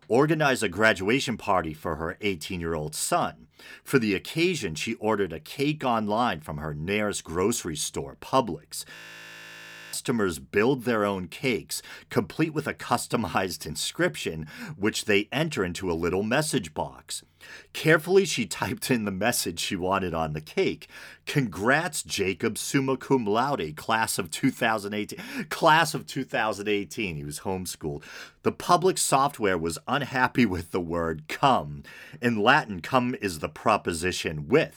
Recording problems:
audio freezing; at 9 s for 1 s

